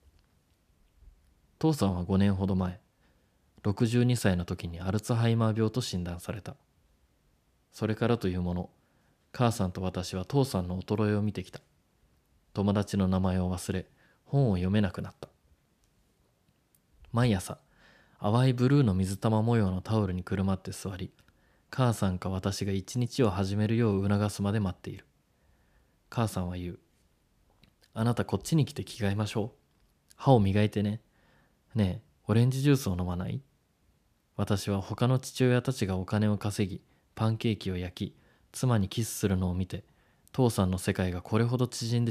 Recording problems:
abrupt cut into speech; at the end

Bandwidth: 14.5 kHz